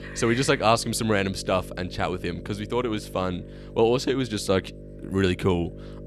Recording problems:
electrical hum; faint; throughout; 50 Hz, 20 dB below the speech

